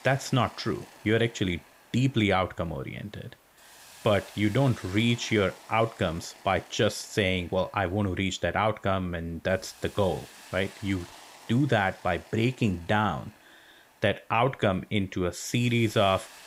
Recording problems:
hiss; faint; throughout; 20 dB below the speech

